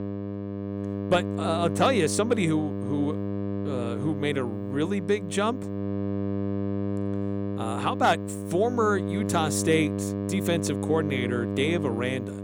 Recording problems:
electrical hum; loud; throughout; 50 Hz, 8 dB below the speech

